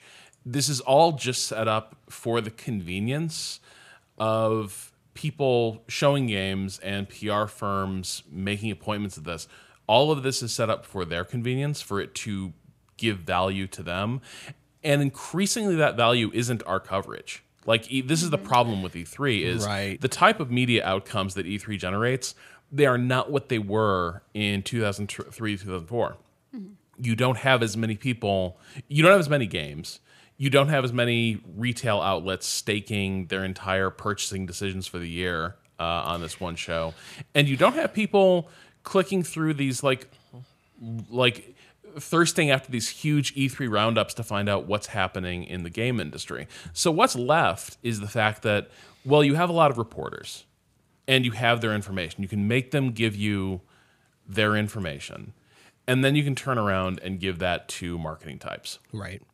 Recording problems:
none

